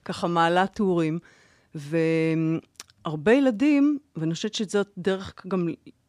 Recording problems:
none

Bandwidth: 14.5 kHz